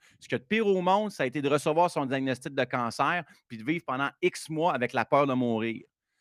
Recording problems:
none

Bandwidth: 15 kHz